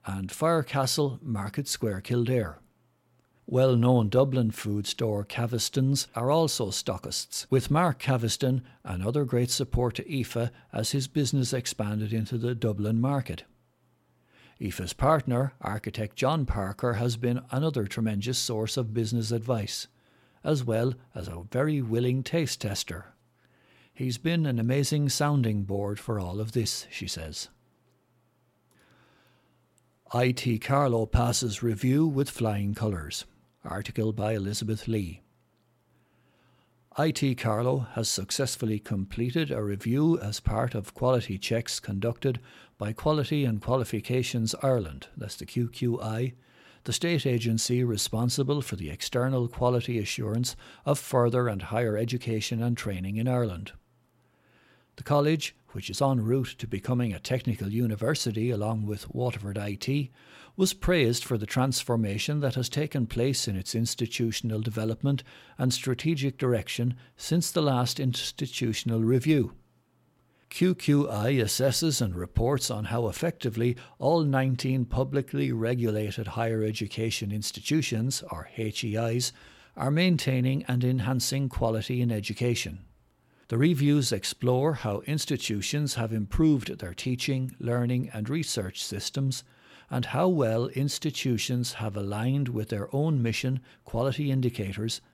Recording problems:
none

